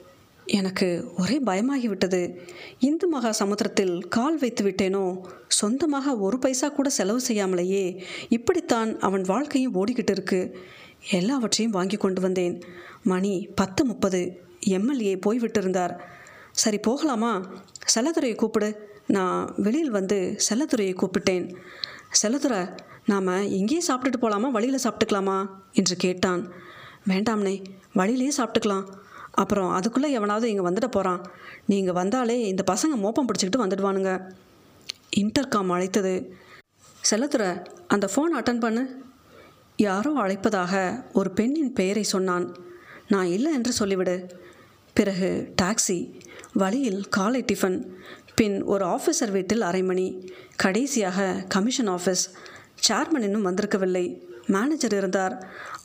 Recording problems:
squashed, flat; somewhat

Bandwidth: 15 kHz